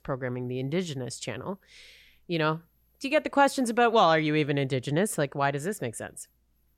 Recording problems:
none

